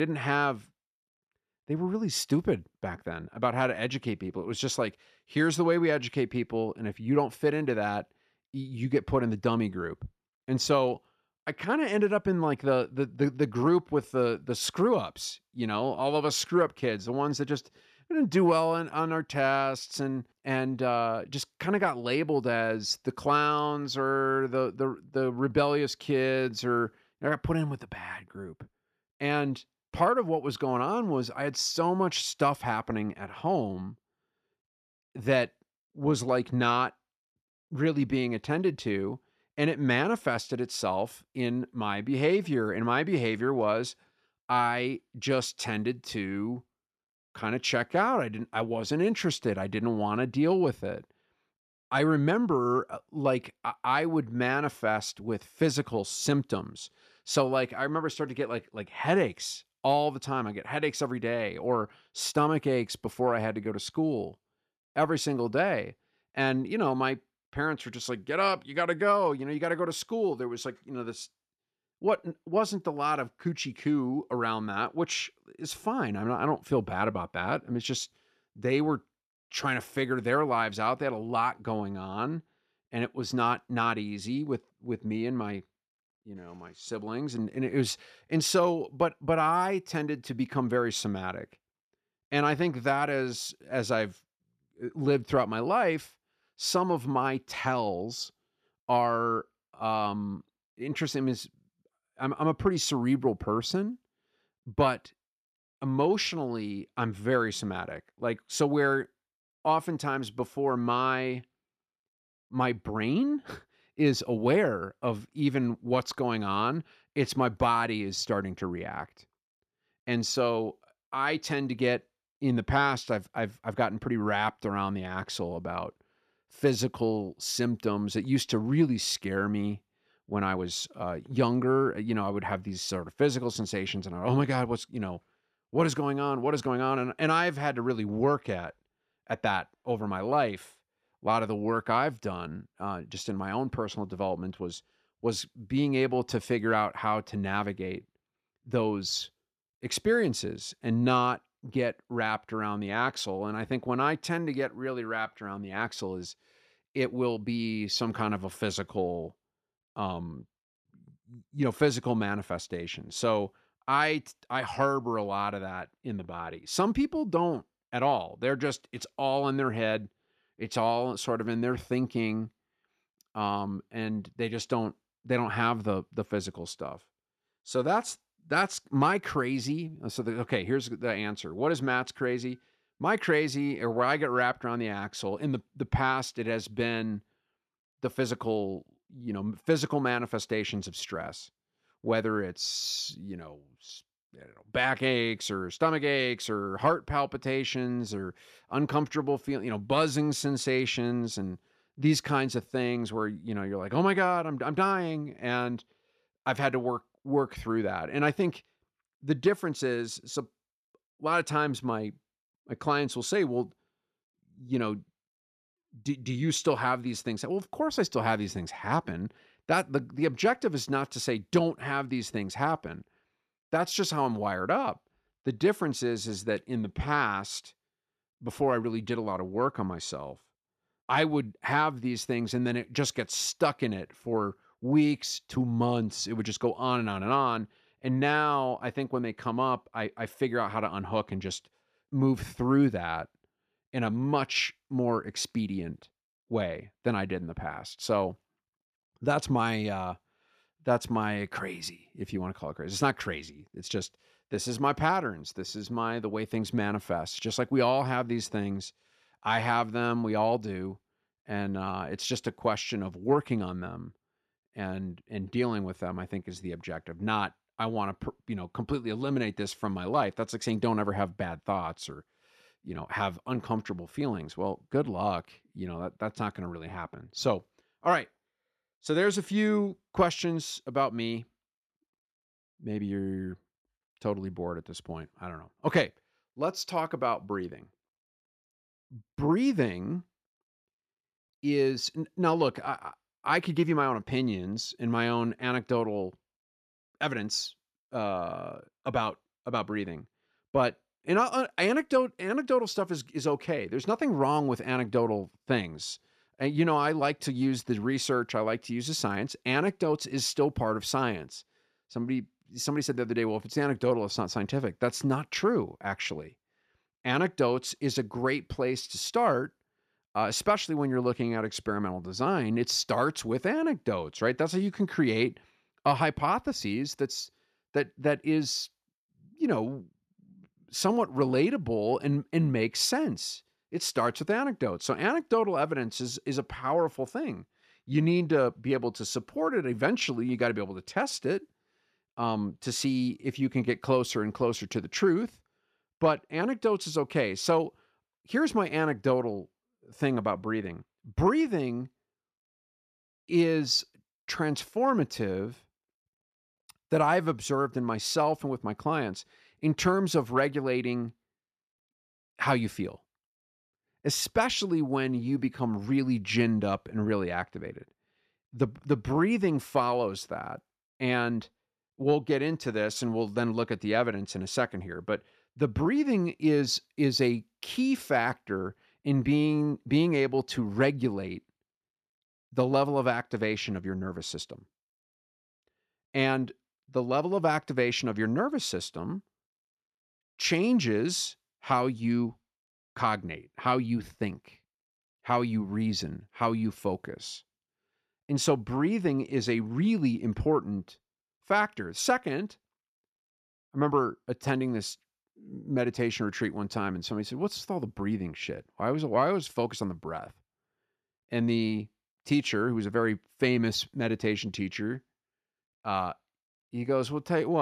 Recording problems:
abrupt cut into speech; at the start and the end

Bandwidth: 14.5 kHz